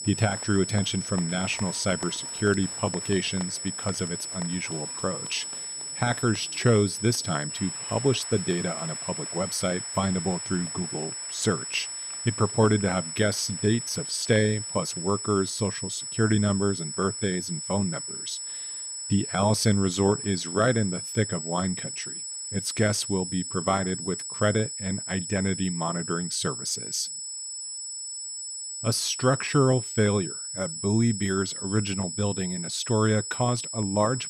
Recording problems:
high-pitched whine; loud; throughout; 8 kHz, 5 dB below the speech
crowd noise; faint; throughout; 20 dB below the speech

